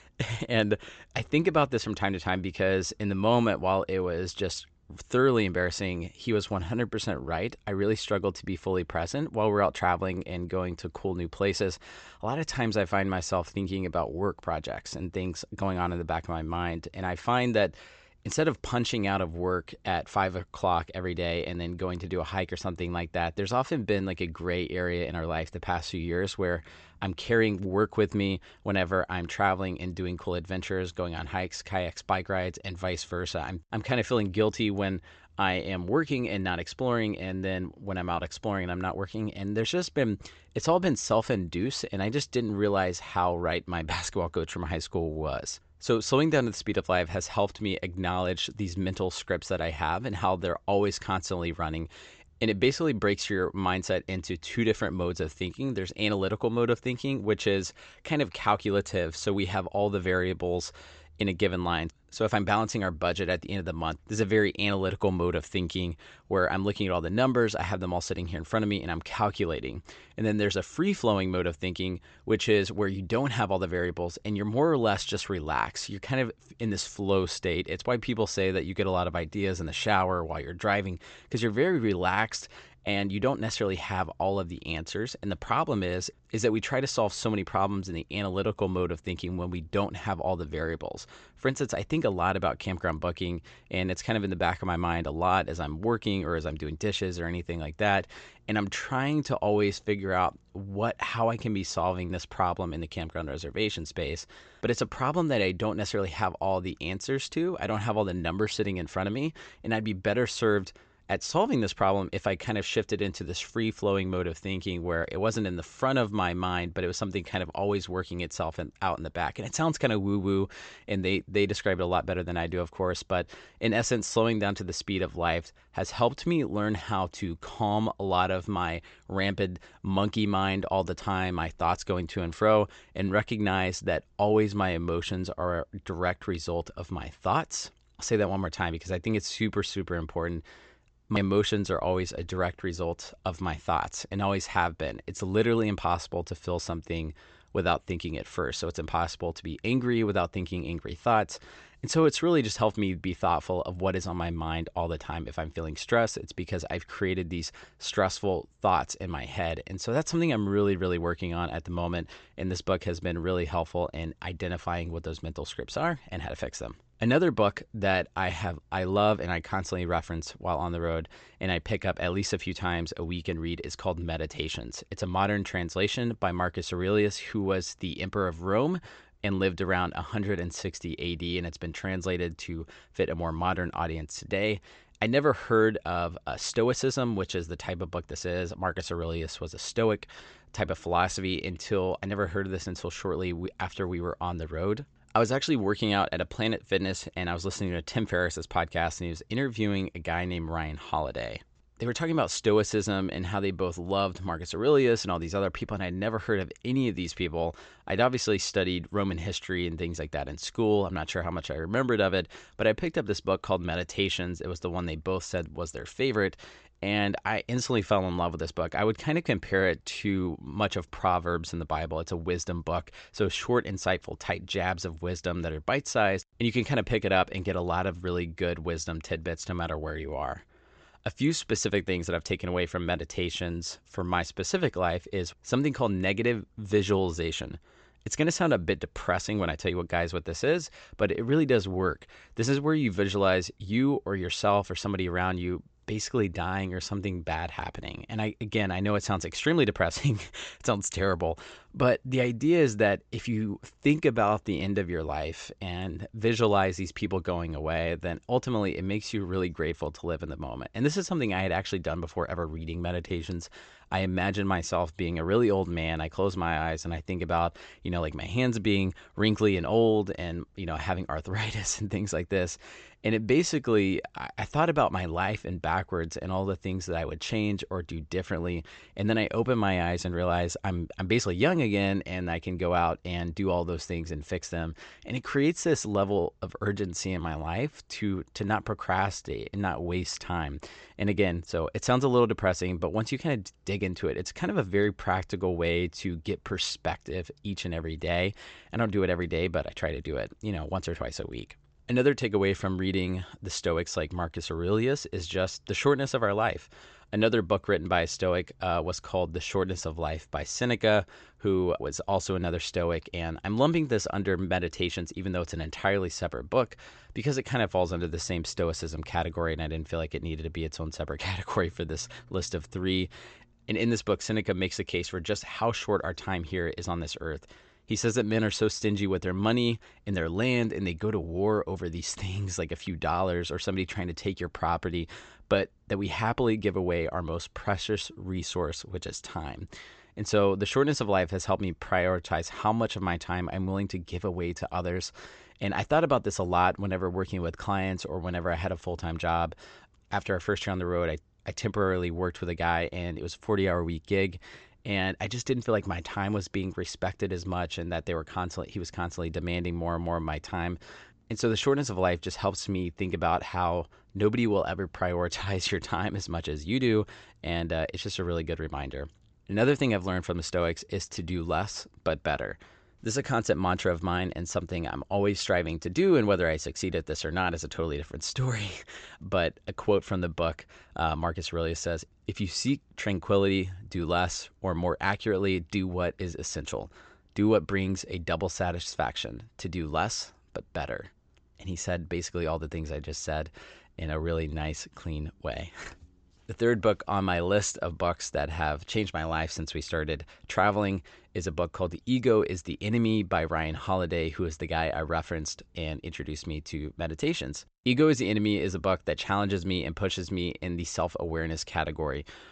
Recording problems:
high frequencies cut off; noticeable; nothing above 8 kHz

